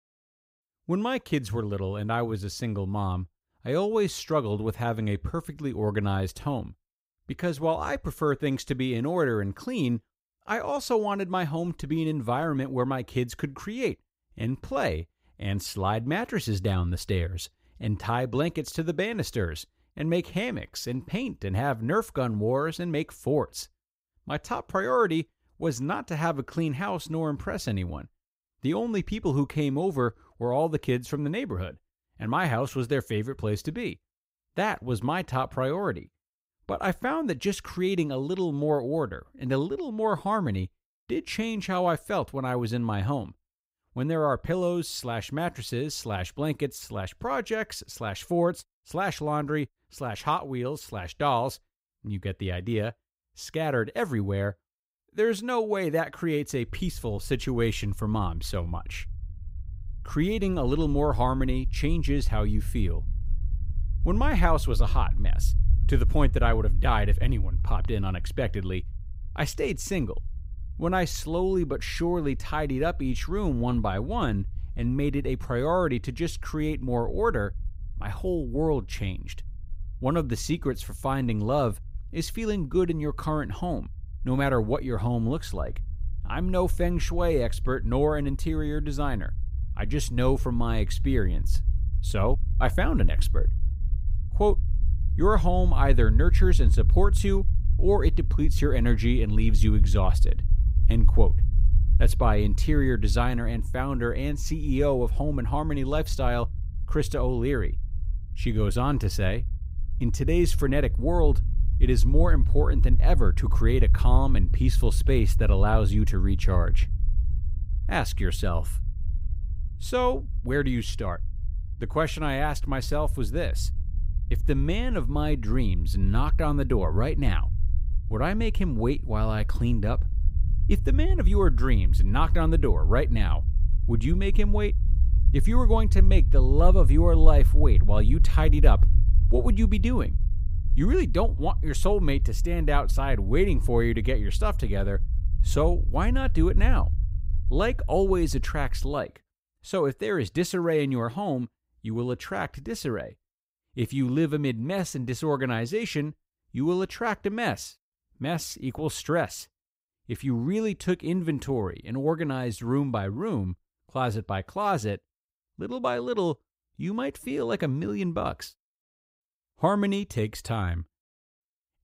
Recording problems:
low rumble; noticeable; from 57 s to 2:29; 20 dB below the speech

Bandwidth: 15.5 kHz